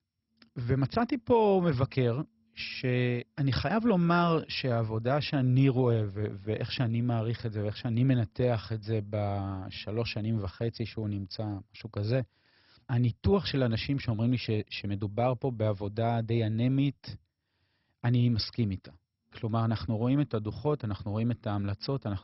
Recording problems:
garbled, watery; badly; nothing above 5.5 kHz

